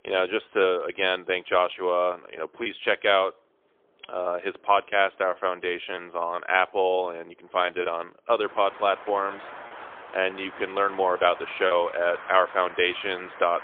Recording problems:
phone-call audio; poor line; nothing above 3.5 kHz
traffic noise; noticeable; throughout; 15 dB below the speech
choppy; occasionally; from 7.5 to 12 s; 3% of the speech affected

